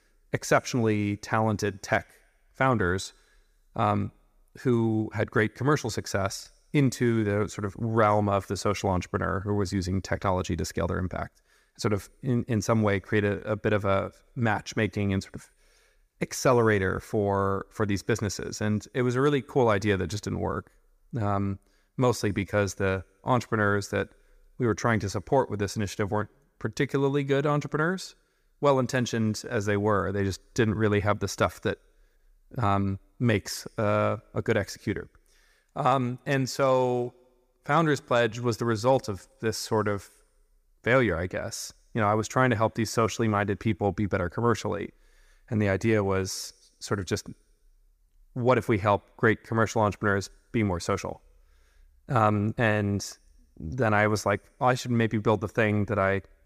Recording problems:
none

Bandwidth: 15 kHz